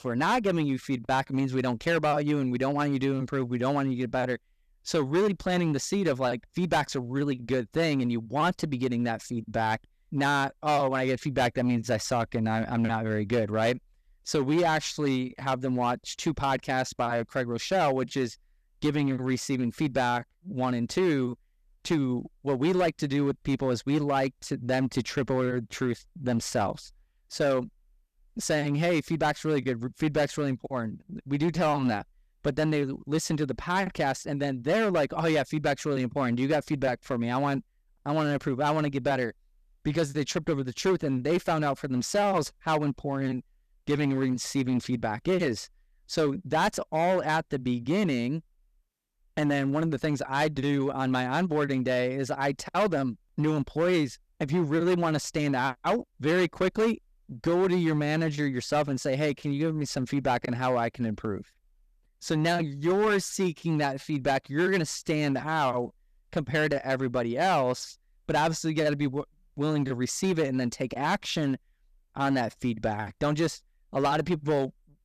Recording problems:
distortion; slight; 7% of the sound clipped

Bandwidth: 14.5 kHz